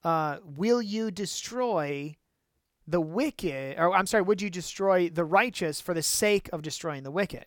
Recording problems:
none

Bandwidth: 17 kHz